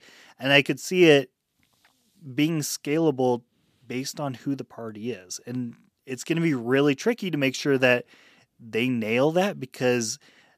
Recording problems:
none

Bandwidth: 14.5 kHz